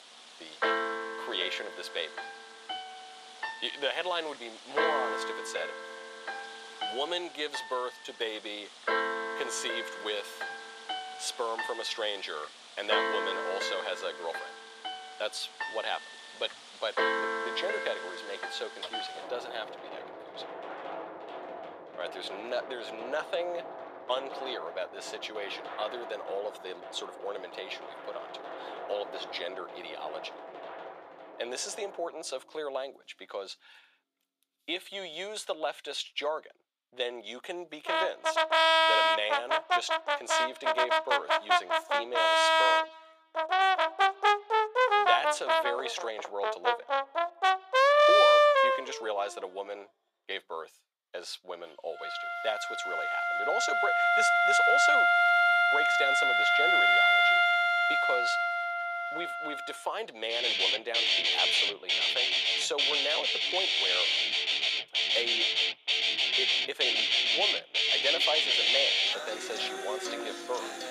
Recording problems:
thin; very; fading below 550 Hz
background music; very loud; throughout; 10 dB above the speech

